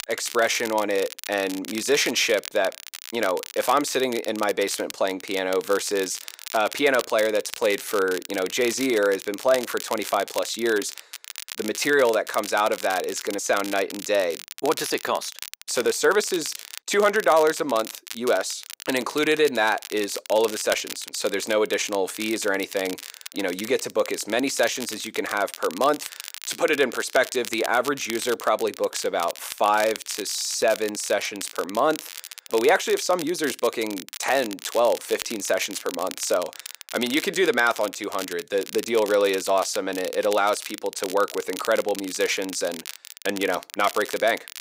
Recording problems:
thin; somewhat; fading below 450 Hz
crackle, like an old record; noticeable; 10 dB below the speech

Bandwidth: 15.5 kHz